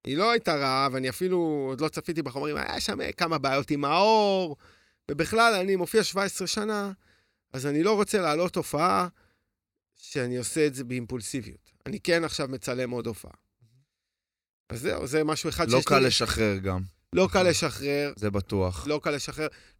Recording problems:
none

